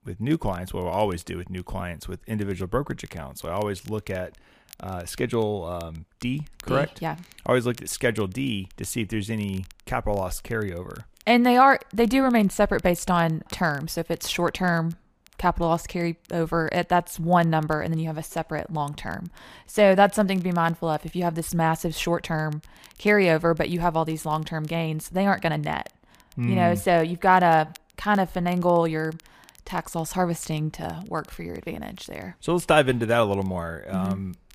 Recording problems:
crackle, like an old record; faint; 30 dB below the speech

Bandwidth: 15 kHz